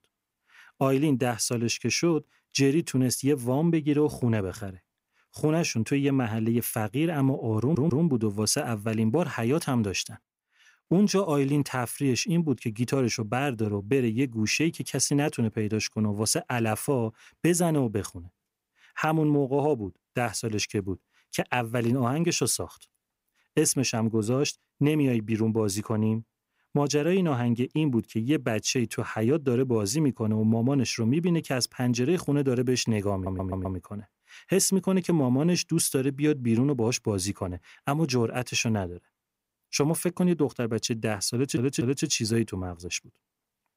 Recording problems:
audio stuttering; at 7.5 s, at 33 s and at 41 s

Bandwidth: 15.5 kHz